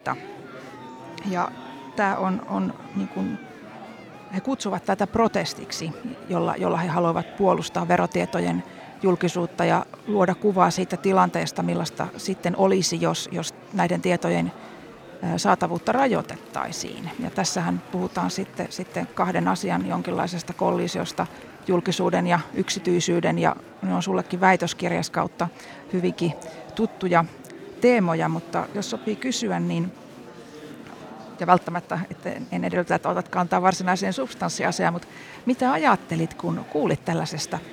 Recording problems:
murmuring crowd; noticeable; throughout; 20 dB below the speech

